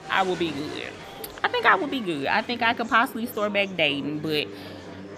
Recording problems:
murmuring crowd; noticeable; throughout; 15 dB below the speech

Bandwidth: 14.5 kHz